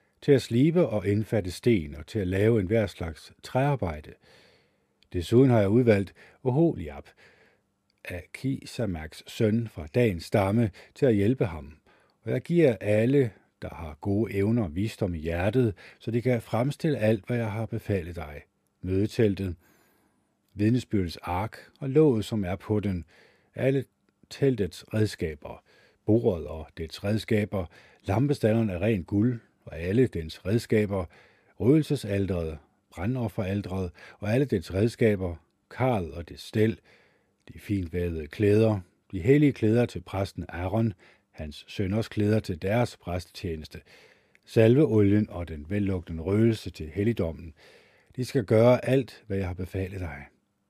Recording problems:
none

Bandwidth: 14.5 kHz